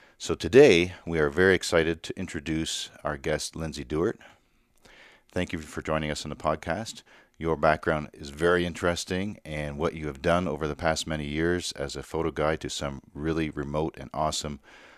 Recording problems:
none

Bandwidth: 14.5 kHz